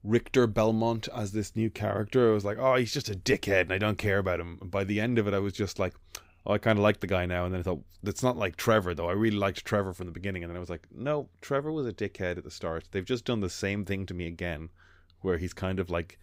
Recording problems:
none

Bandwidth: 15.5 kHz